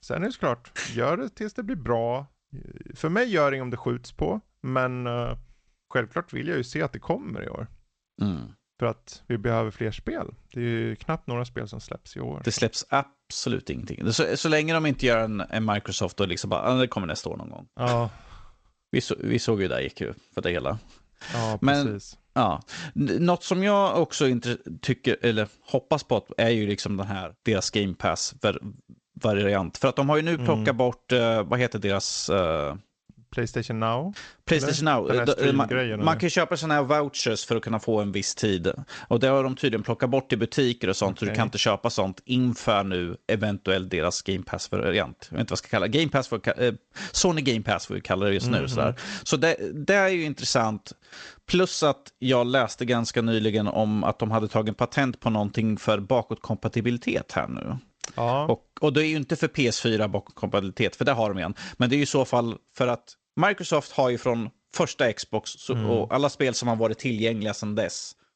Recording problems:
garbled, watery; slightly; nothing above 7.5 kHz

